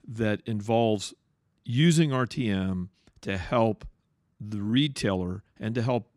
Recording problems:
uneven, jittery; slightly; from 1.5 to 5 s

